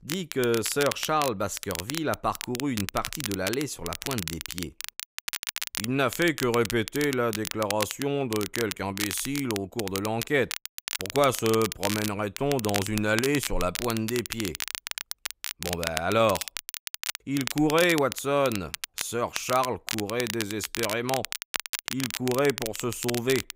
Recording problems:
crackle, like an old record; loud; 6 dB below the speech

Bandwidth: 15.5 kHz